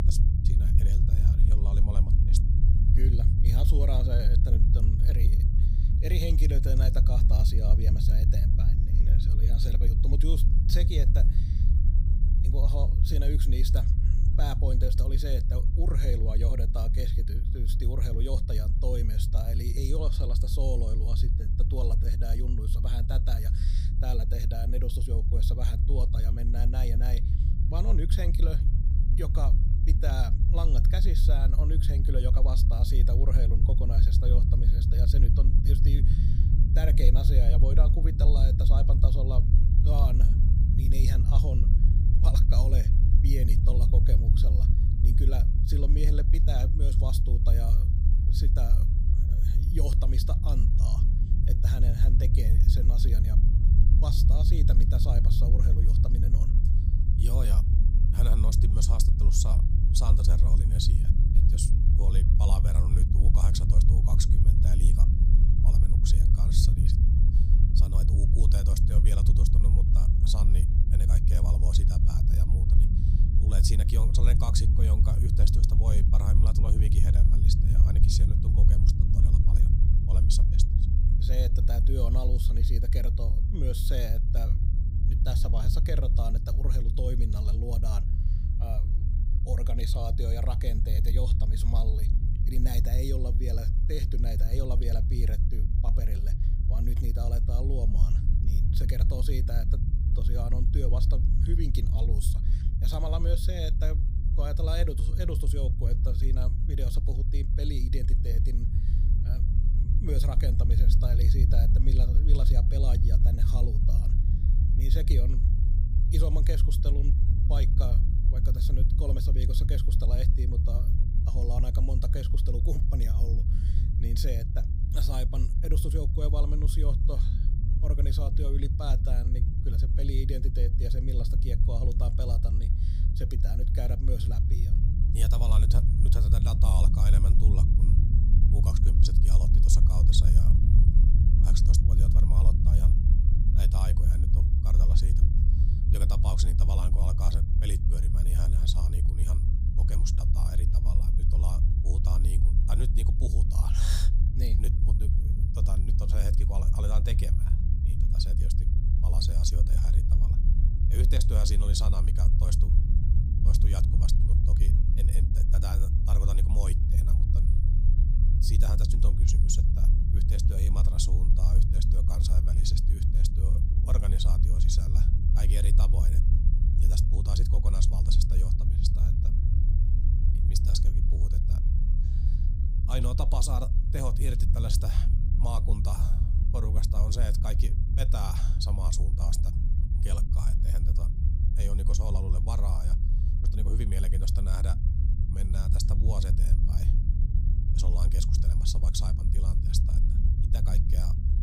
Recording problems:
low rumble; loud; throughout; 2 dB below the speech

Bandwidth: 15.5 kHz